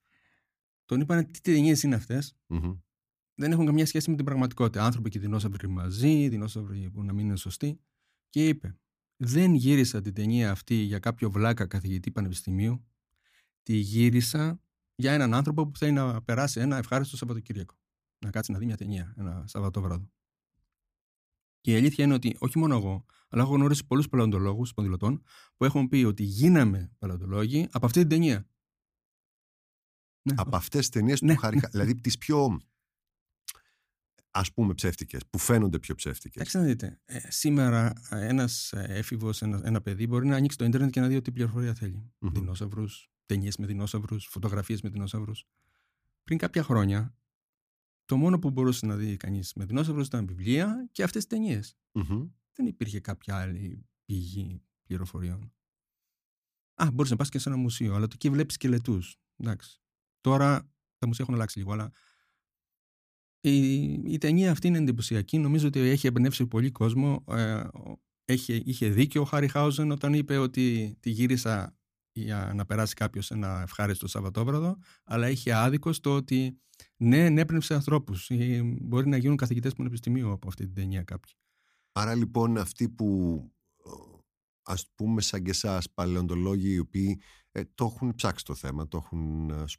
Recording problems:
uneven, jittery; strongly; from 0.5 s to 1:28

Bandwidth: 15 kHz